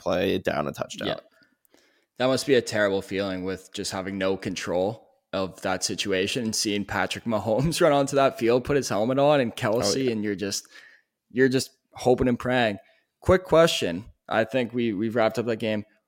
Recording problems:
none

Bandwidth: 16.5 kHz